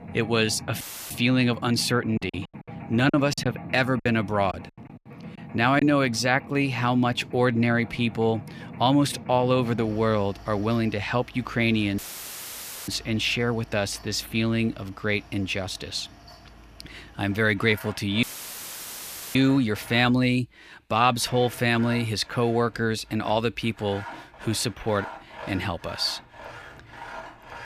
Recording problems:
machinery noise; noticeable; throughout; 15 dB below the speech
audio cutting out; filled with static; at 1 s, at 12 s for 1 s and at 18 s for 1 s
choppy; very; from 2 to 6 s; 12% of the speech affected

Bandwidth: 14.5 kHz